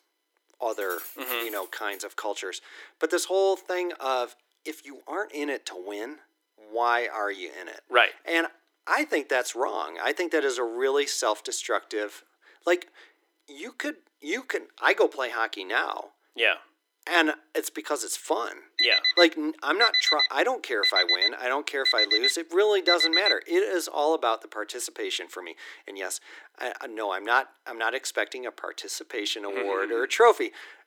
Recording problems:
thin; very; fading below 300 Hz
jangling keys; noticeable; from 0.5 to 2 s; peak 8 dB below the speech
alarm; loud; from 19 to 23 s; peak 7 dB above the speech

